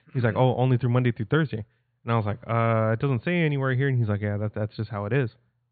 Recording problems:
high frequencies cut off; severe; nothing above 4.5 kHz

